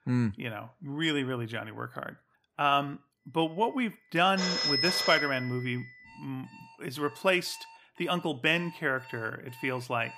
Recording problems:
alarms or sirens; very loud; from 4 s on; as loud as the speech

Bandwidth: 15 kHz